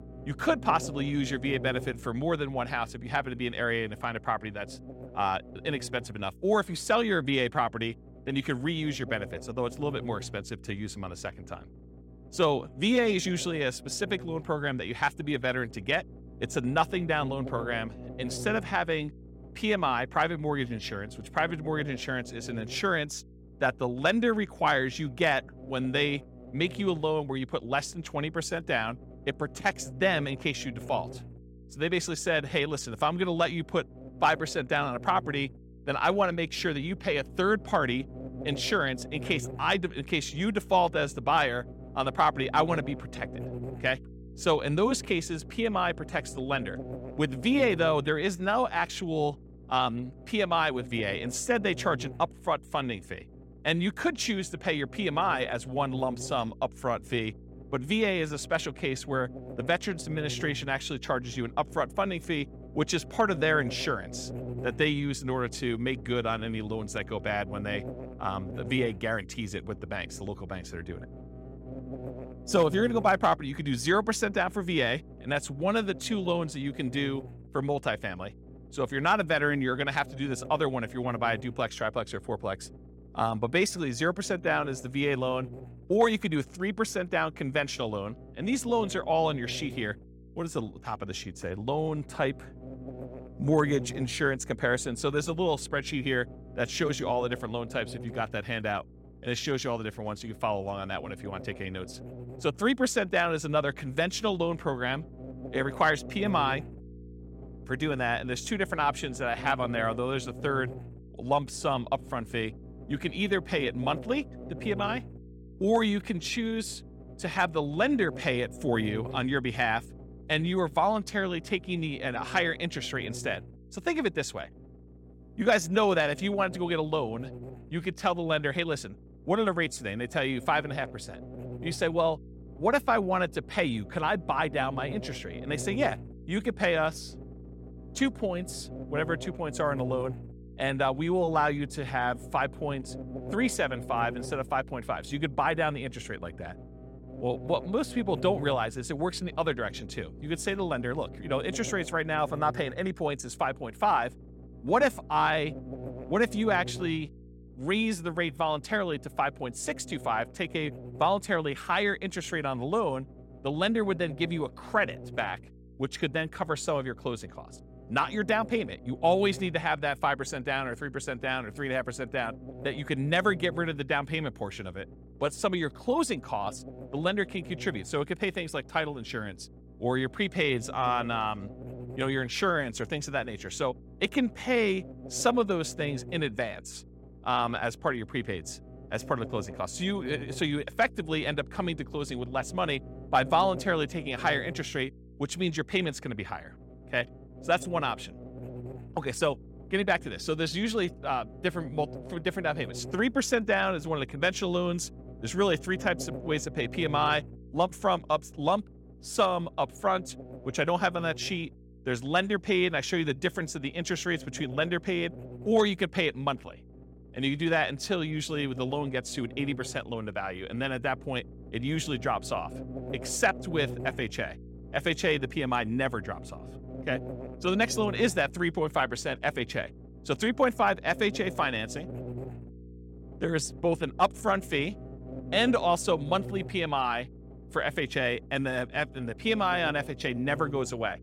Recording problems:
electrical hum; noticeable; throughout; 60 Hz, 20 dB below the speech

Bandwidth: 16.5 kHz